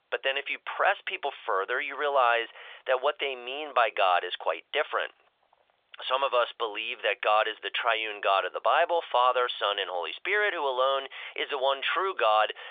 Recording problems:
thin; very; fading below 550 Hz
phone-call audio

